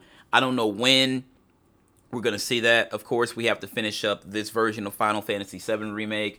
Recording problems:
none

